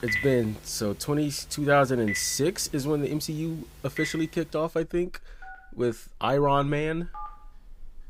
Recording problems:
alarms or sirens; noticeable; throughout; 10 dB below the speech

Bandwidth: 15.5 kHz